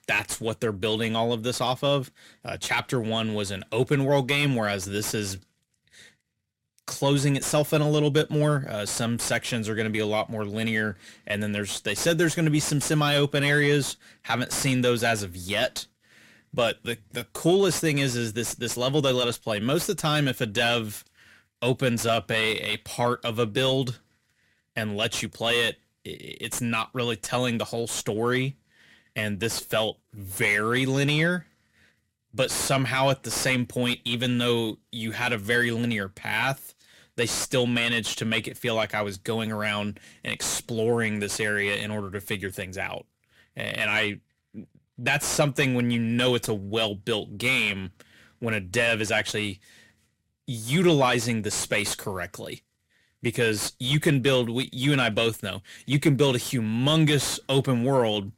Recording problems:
distortion; slight; 10 dB below the speech

